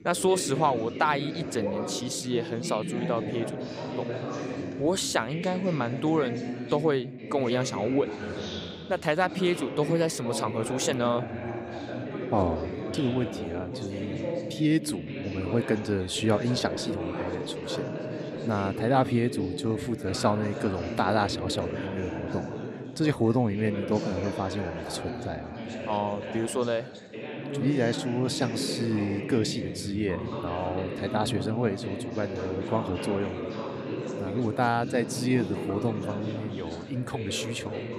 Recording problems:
background chatter; loud; throughout; 3 voices, 6 dB below the speech

